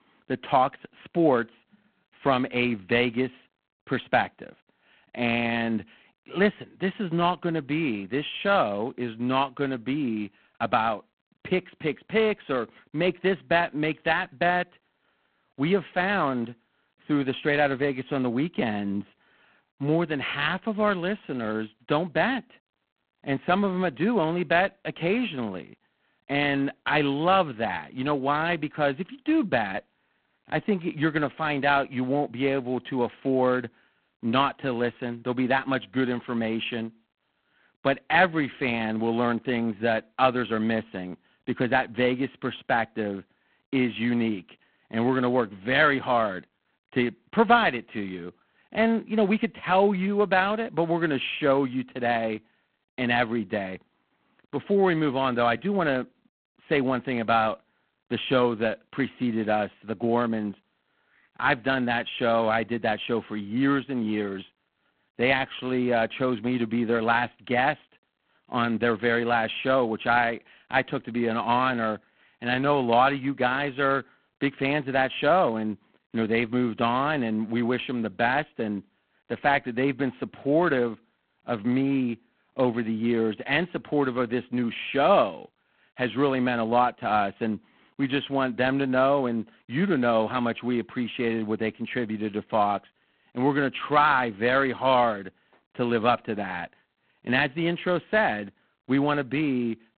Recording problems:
phone-call audio; poor line; nothing above 3.5 kHz

